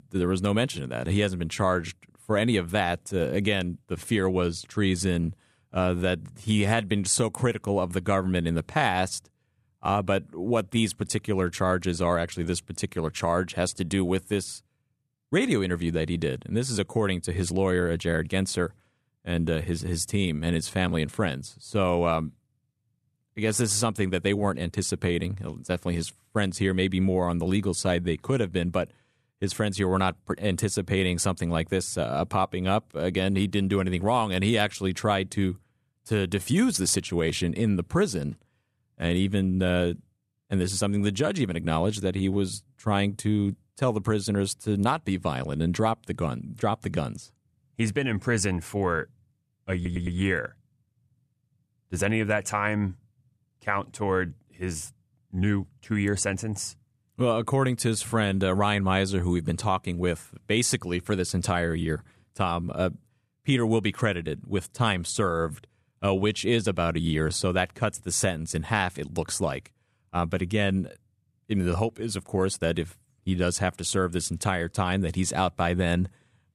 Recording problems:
audio stuttering; at 50 s

